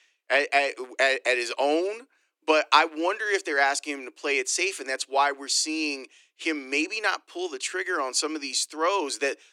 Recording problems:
thin; somewhat; fading below 300 Hz

